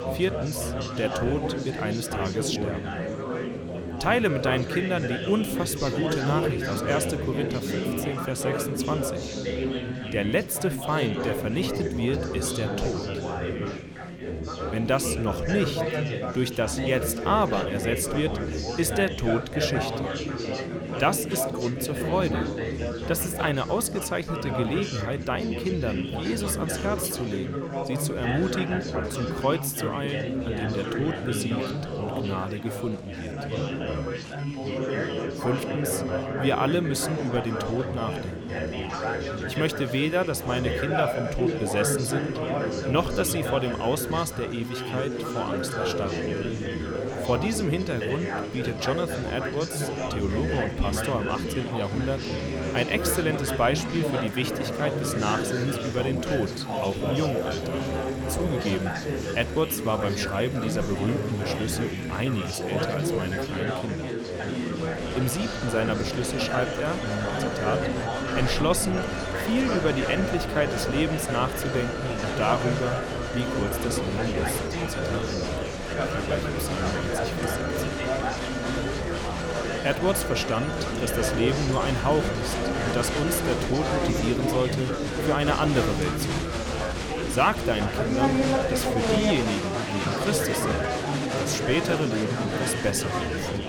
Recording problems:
alarms or sirens; loud; throughout; 8 dB below the speech
chatter from many people; loud; throughout; 1 dB below the speech

